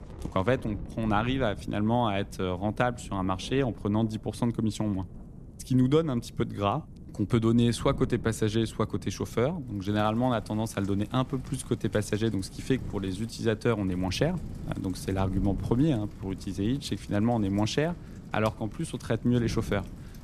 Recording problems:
wind noise on the microphone; occasional gusts; 20 dB below the speech
rain or running water; faint; throughout; 25 dB below the speech

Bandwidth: 14 kHz